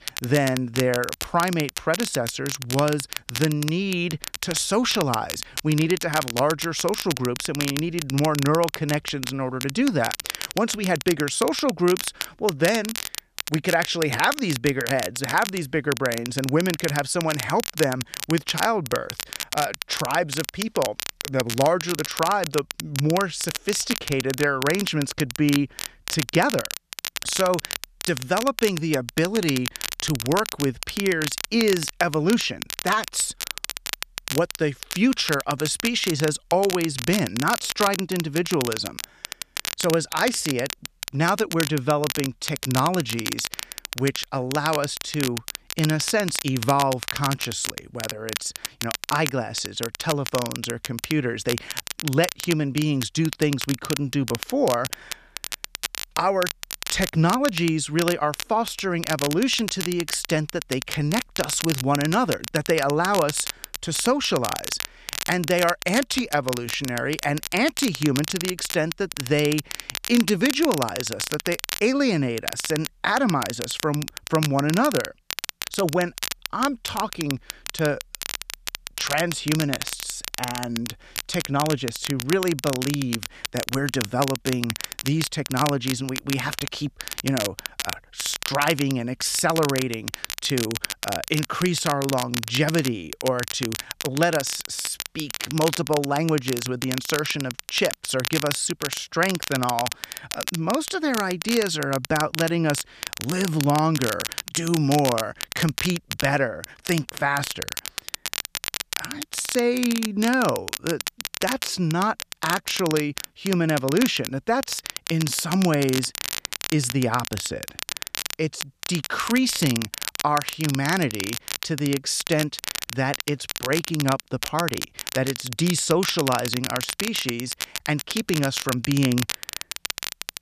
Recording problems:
crackle, like an old record; loud; 6 dB below the speech

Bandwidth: 14.5 kHz